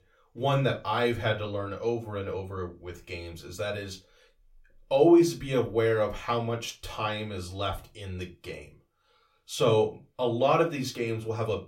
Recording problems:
room echo; very slight; dies away in 0.2 s
off-mic speech; somewhat distant

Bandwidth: 16.5 kHz